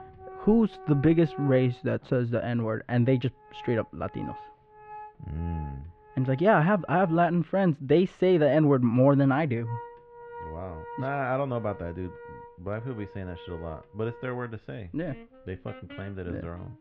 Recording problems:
muffled; very; fading above 3 kHz
background music; noticeable; throughout; 20 dB below the speech

